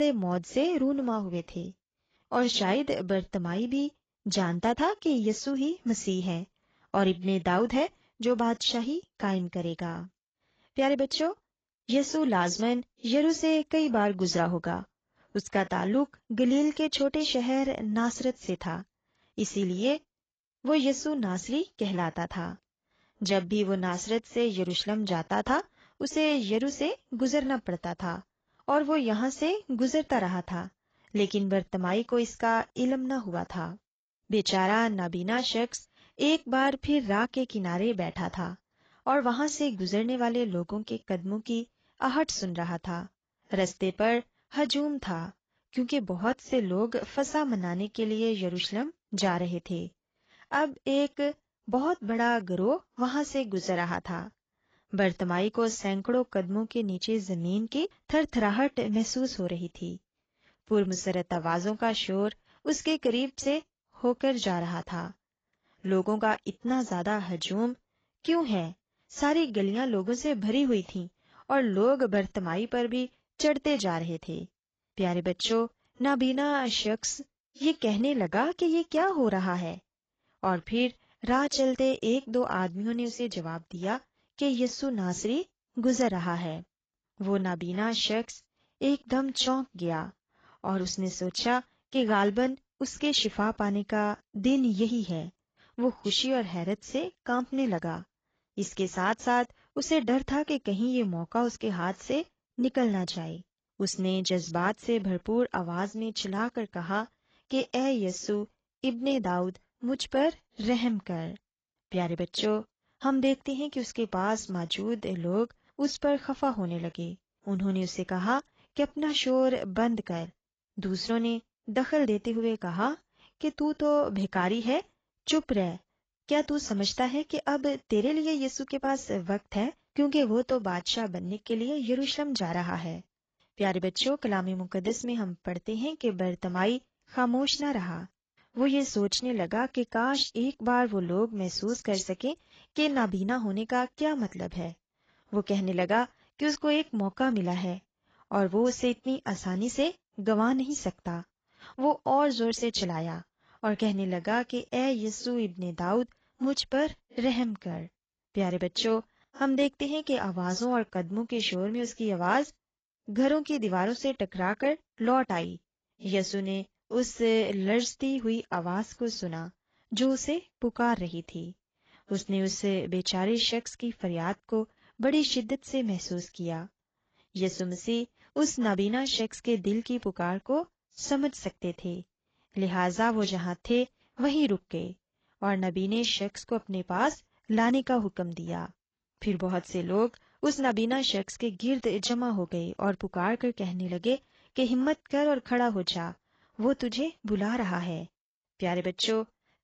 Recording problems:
garbled, watery; badly; nothing above 7.5 kHz
abrupt cut into speech; at the start

